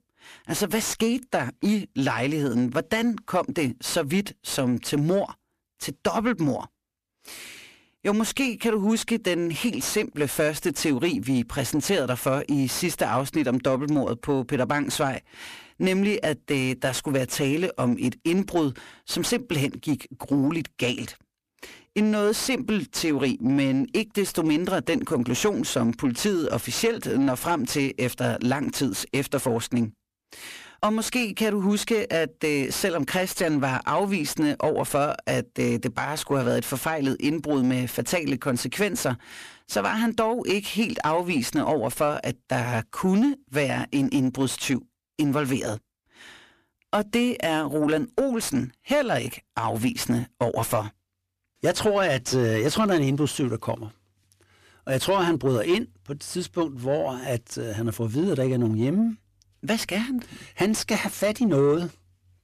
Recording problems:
distortion; slight; 10 dB below the speech

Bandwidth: 14.5 kHz